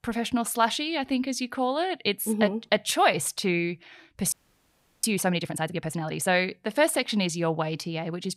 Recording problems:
audio freezing; at 4.5 s for 0.5 s

